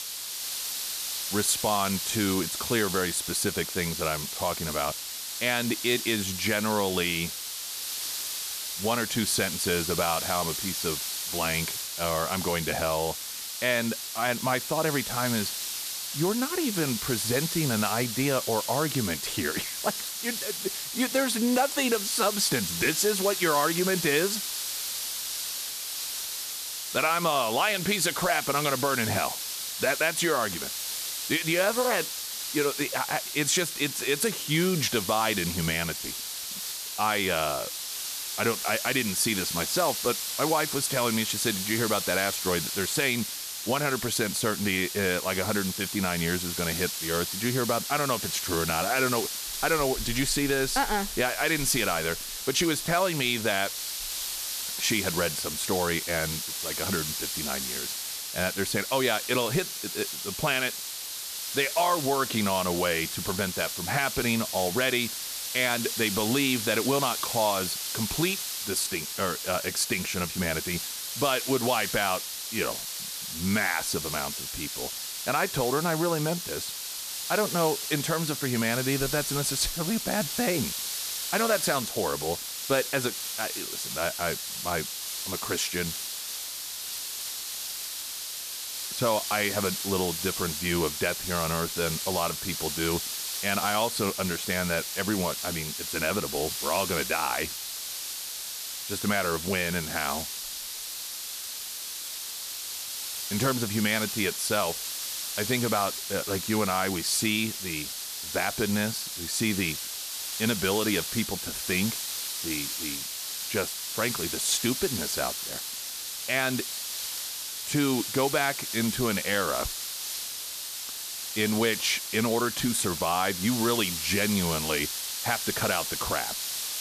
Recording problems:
hiss; loud; throughout; 3 dB below the speech

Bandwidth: 14.5 kHz